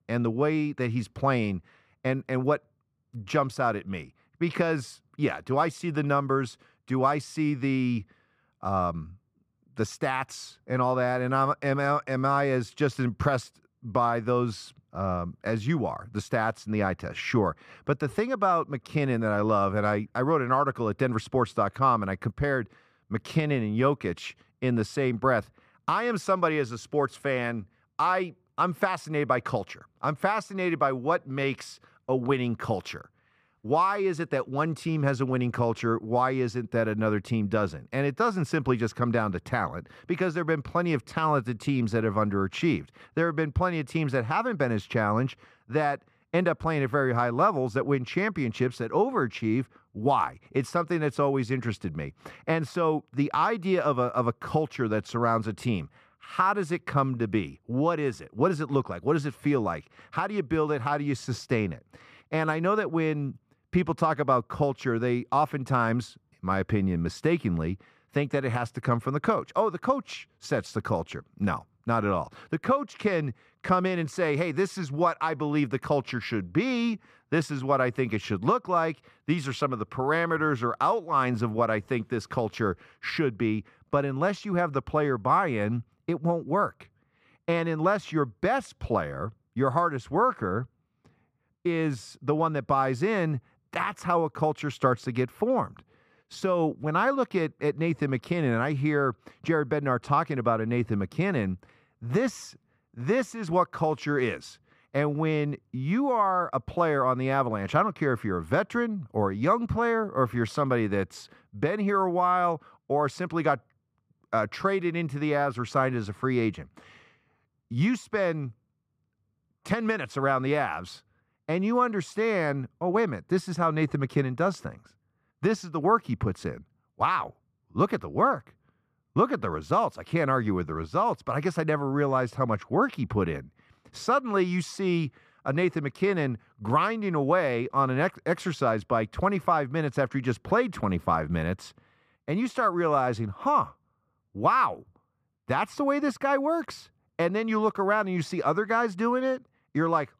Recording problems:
muffled; slightly; fading above 3 kHz

